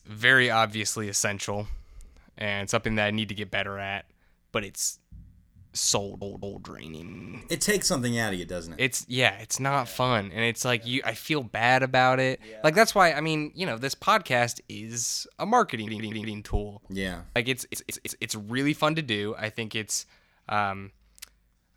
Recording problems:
audio stuttering; 4 times, first at 6 s

